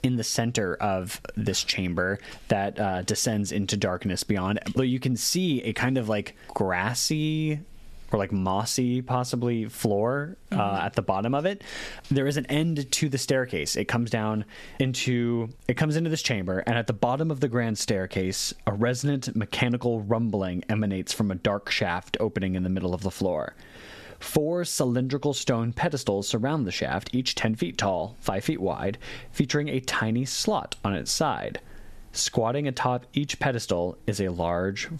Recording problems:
squashed, flat; somewhat

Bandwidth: 13.5 kHz